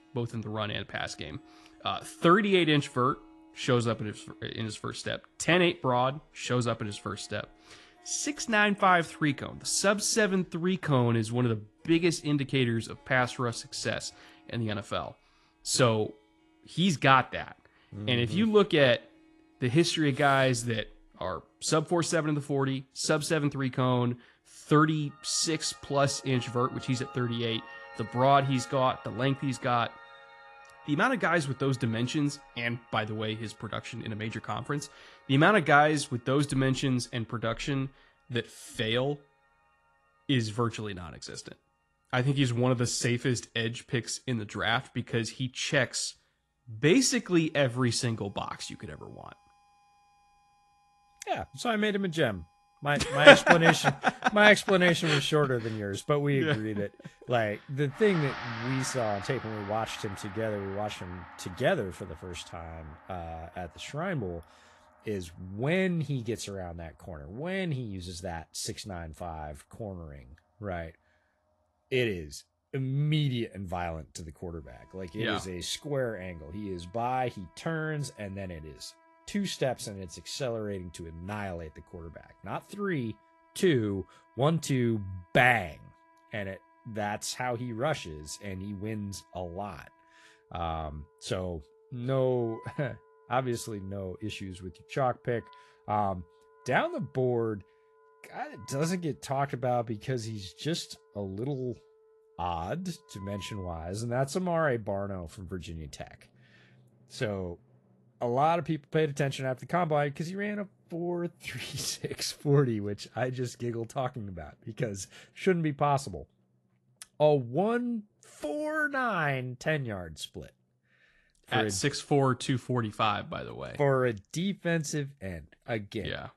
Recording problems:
garbled, watery; slightly; nothing above 11.5 kHz
background music; faint; throughout; 25 dB below the speech

